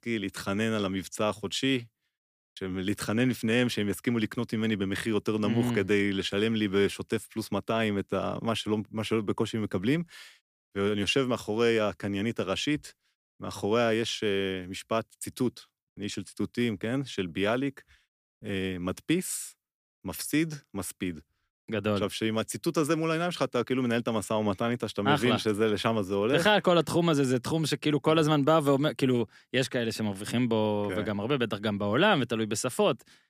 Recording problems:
none

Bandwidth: 15 kHz